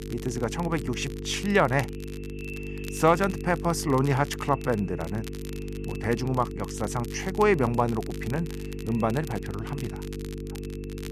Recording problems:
echo of what is said; faint; throughout; 450 ms later, 20 dB below the speech
electrical hum; noticeable; throughout; 50 Hz, 15 dB below the speech
crackle, like an old record; faint; 20 dB below the speech

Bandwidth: 14.5 kHz